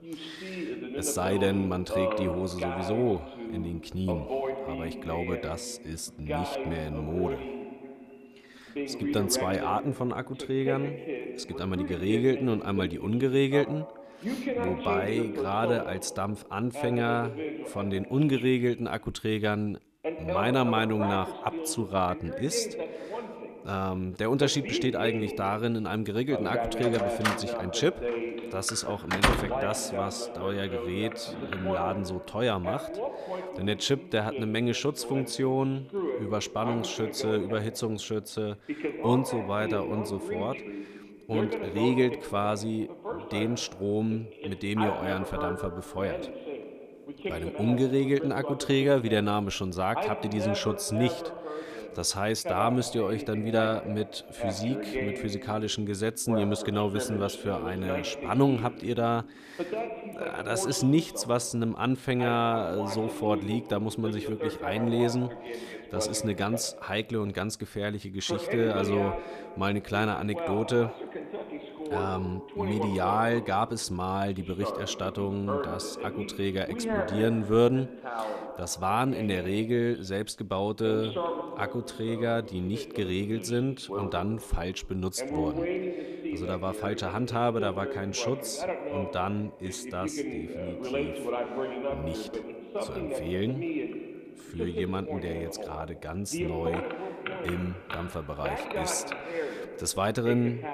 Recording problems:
voice in the background; loud; throughout; 6 dB below the speech
door banging; loud; from 27 to 29 s; peak 6 dB above the speech

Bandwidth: 14.5 kHz